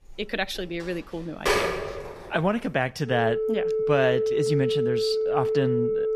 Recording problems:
alarms or sirens; very loud; throughout; 2 dB above the speech

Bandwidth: 14.5 kHz